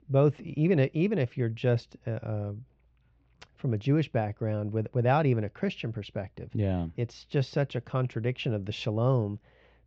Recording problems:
muffled; very; fading above 3 kHz
high frequencies cut off; noticeable; nothing above 8 kHz

